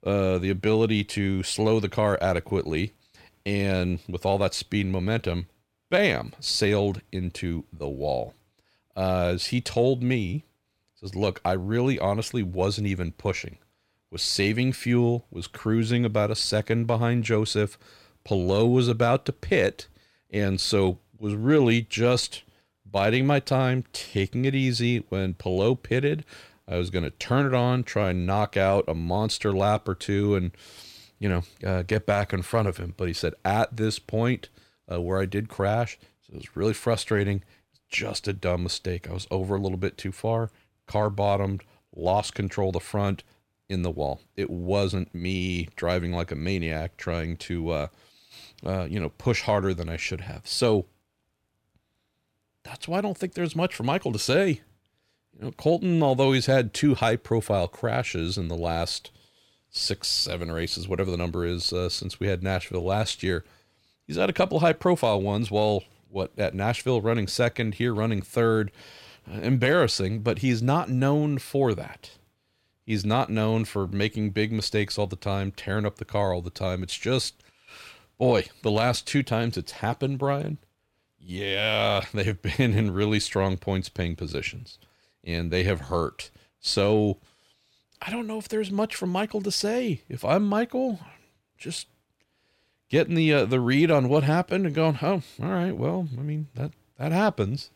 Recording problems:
none

